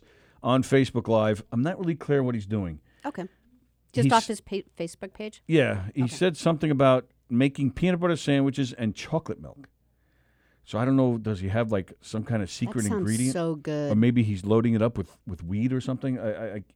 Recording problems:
none

